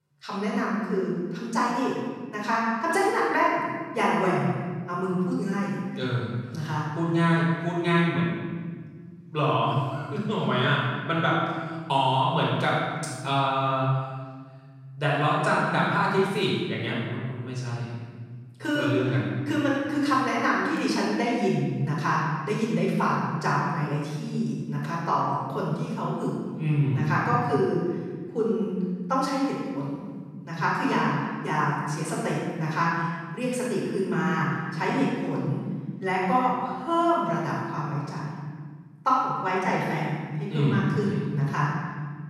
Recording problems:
room echo; strong; dies away in 1.8 s
off-mic speech; far

